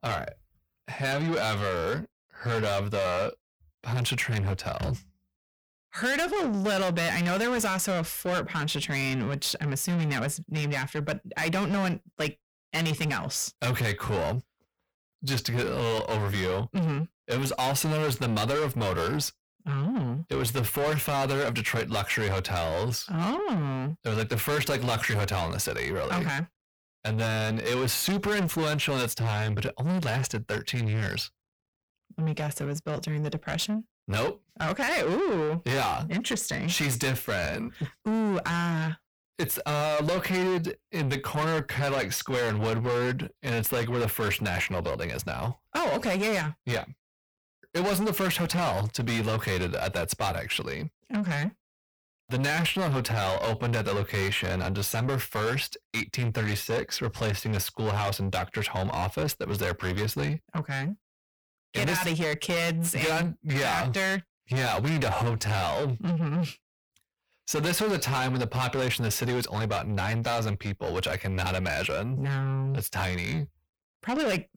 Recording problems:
distortion; heavy; 6 dB below the speech

